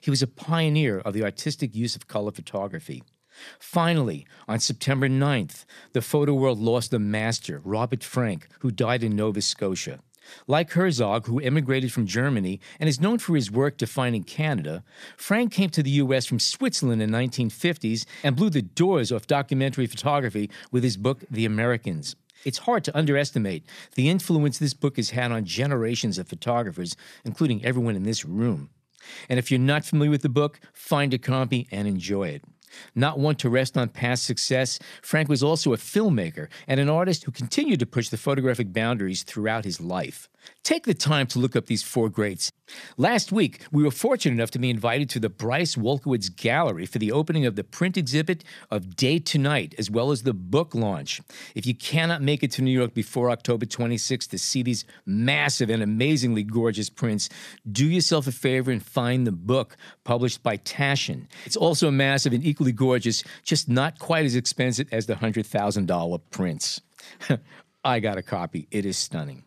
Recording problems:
none

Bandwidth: 14.5 kHz